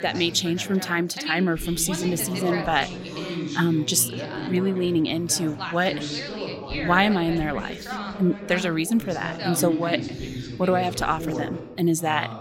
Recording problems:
background chatter; loud; throughout; 3 voices, 8 dB below the speech

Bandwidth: 16 kHz